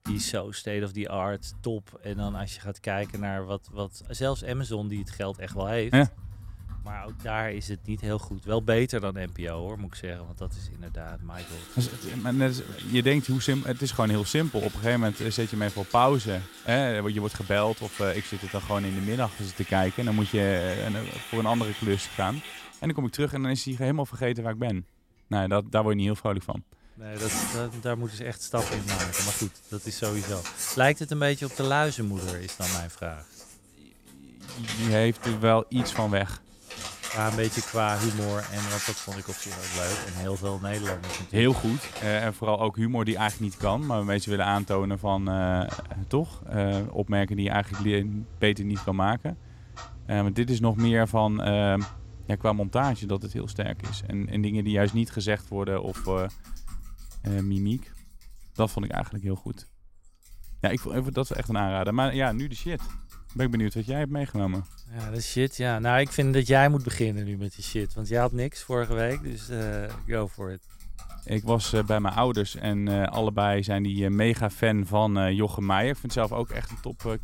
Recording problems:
household noises; noticeable; throughout; 10 dB below the speech

